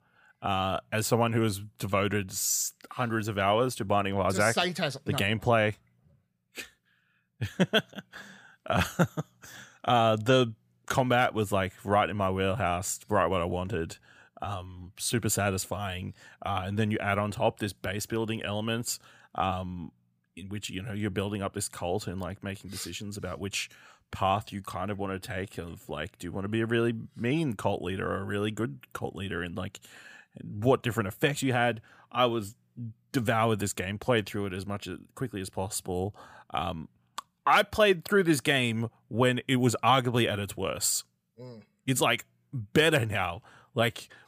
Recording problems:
none

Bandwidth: 15 kHz